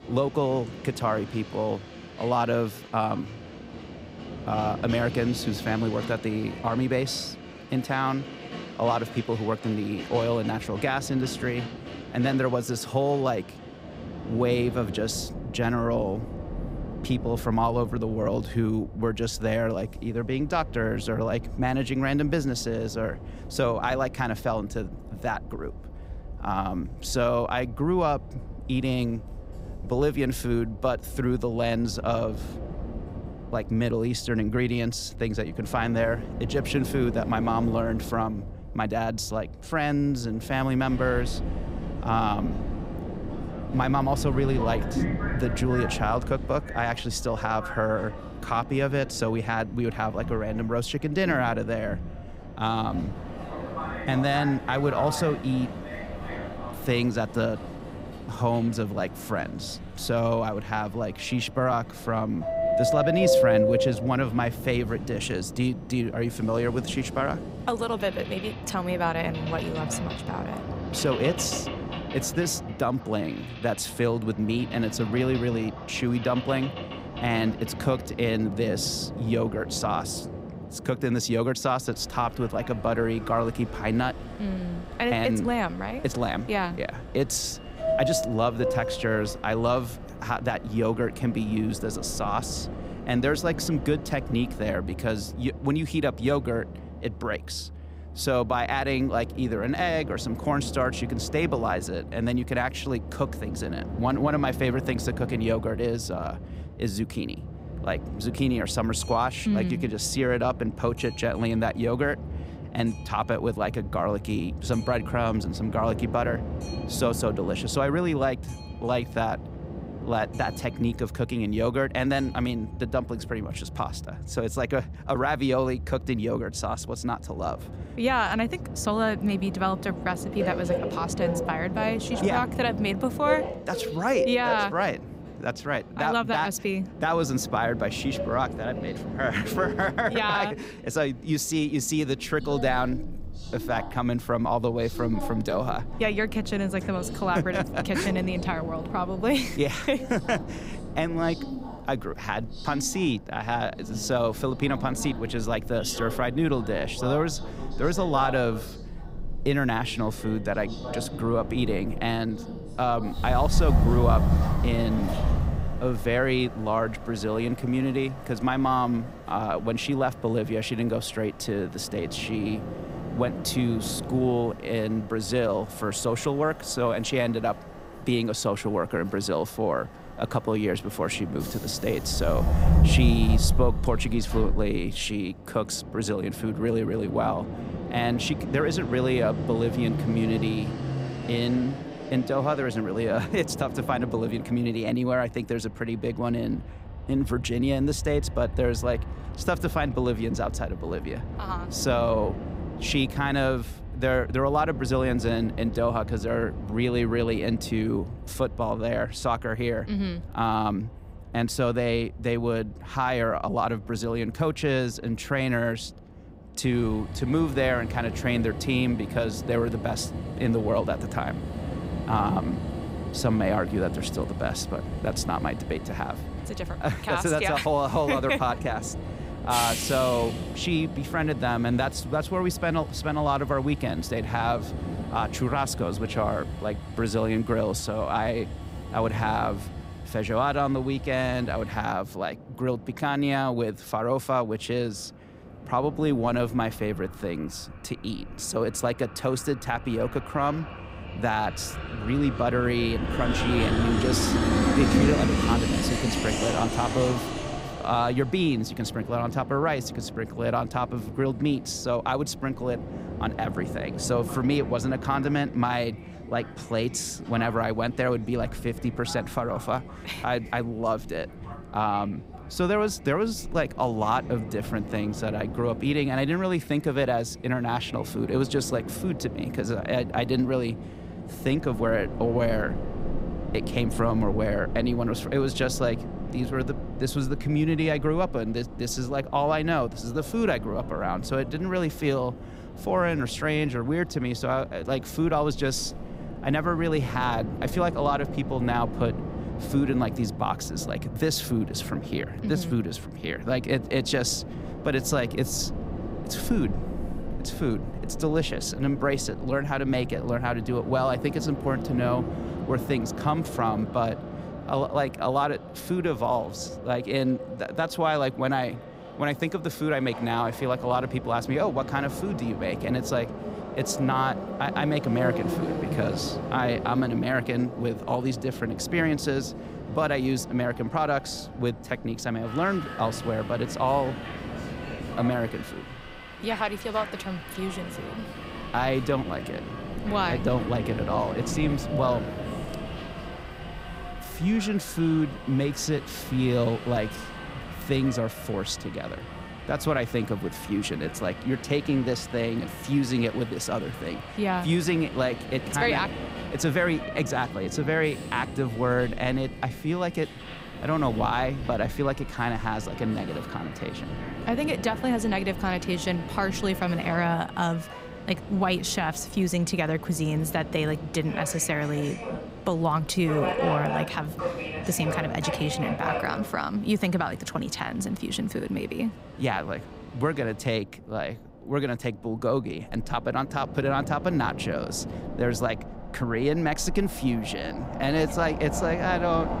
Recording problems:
train or aircraft noise; loud; throughout; 7 dB below the speech

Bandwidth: 15.5 kHz